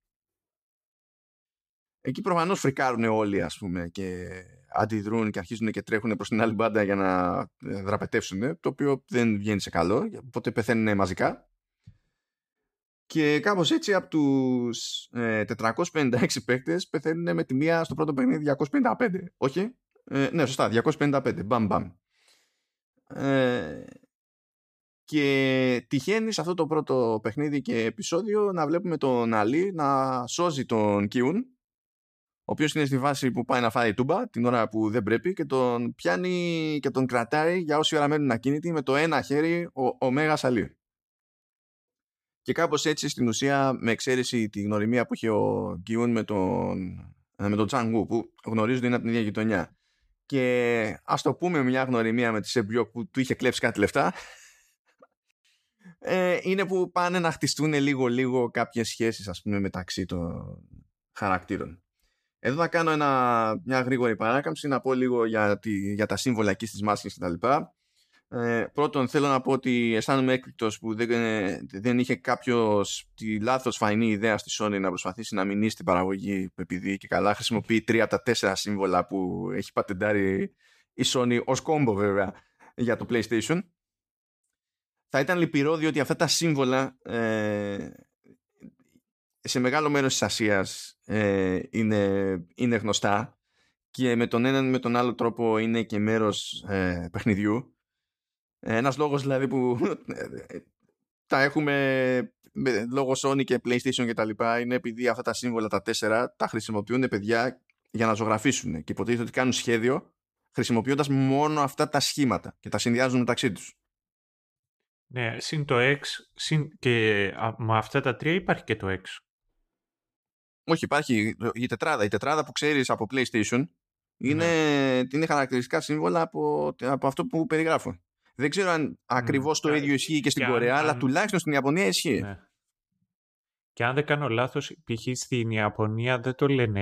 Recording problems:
abrupt cut into speech; at the end

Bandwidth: 14.5 kHz